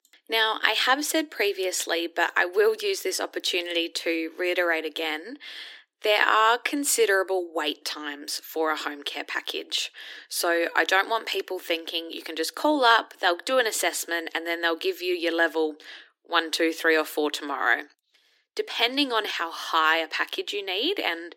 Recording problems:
thin; somewhat; fading below 300 Hz

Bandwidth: 16.5 kHz